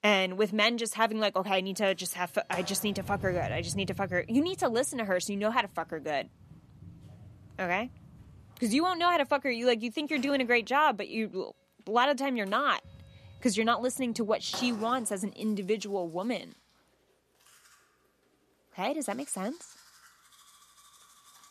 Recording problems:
household noises; noticeable; throughout; 20 dB below the speech

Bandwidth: 14 kHz